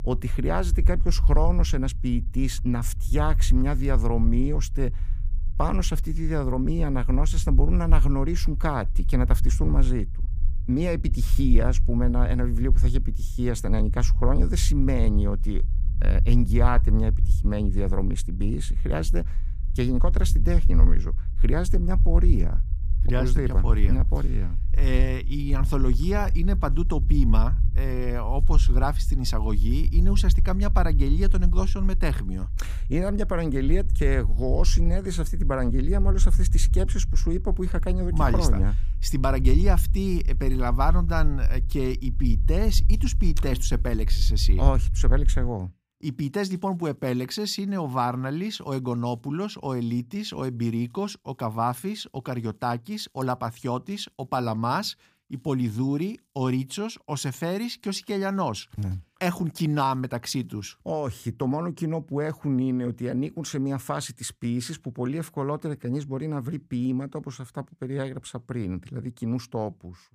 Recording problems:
low rumble; noticeable; until 45 s; 15 dB below the speech

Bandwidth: 15 kHz